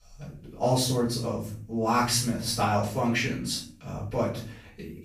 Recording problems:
off-mic speech; far
room echo; noticeable; dies away in 0.5 s

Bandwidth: 15 kHz